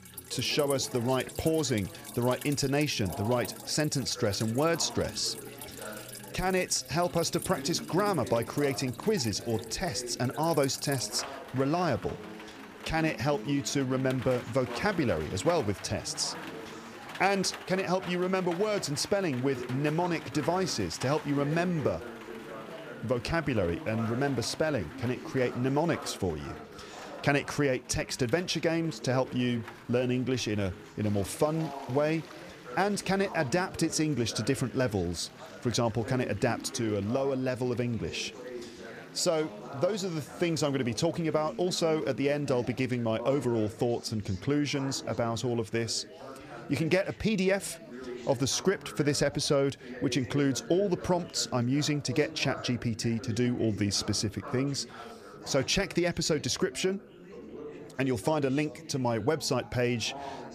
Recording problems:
rain or running water; noticeable; throughout; 15 dB below the speech
chatter from many people; noticeable; throughout; 15 dB below the speech

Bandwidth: 15 kHz